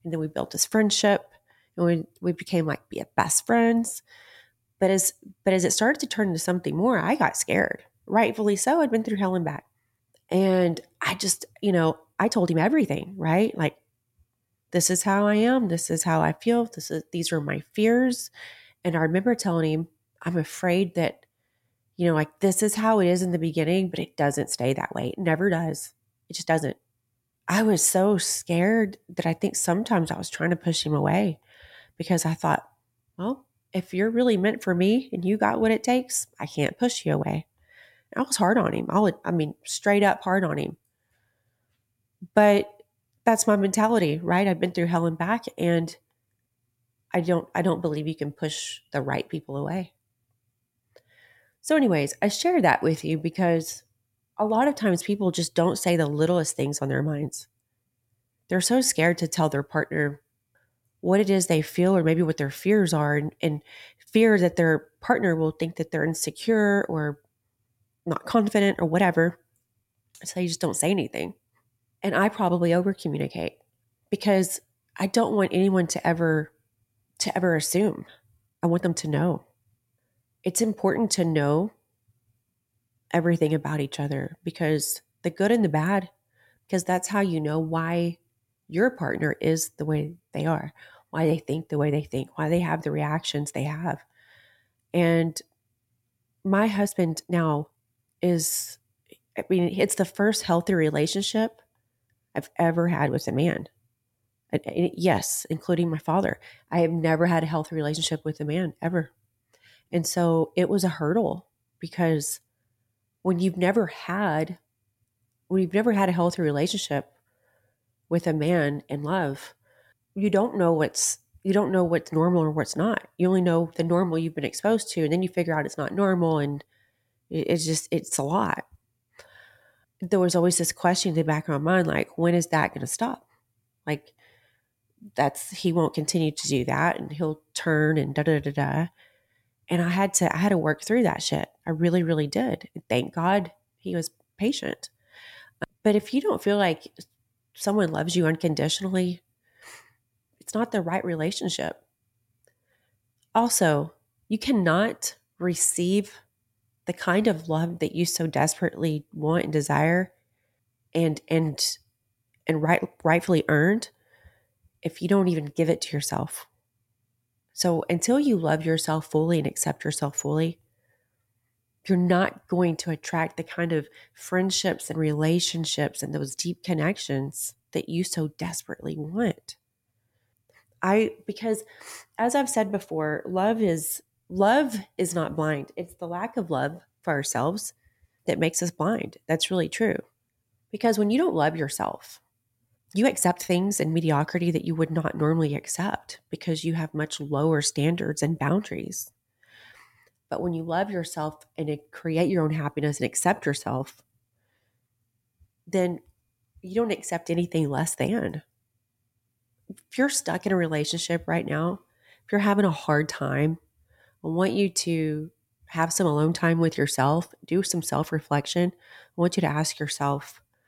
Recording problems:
uneven, jittery; strongly; from 10 s to 3:14

